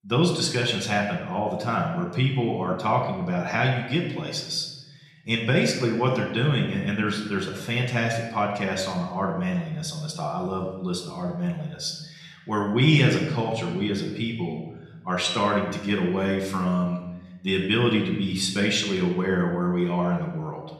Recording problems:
room echo; slight; dies away in 1 s
off-mic speech; somewhat distant

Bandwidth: 14 kHz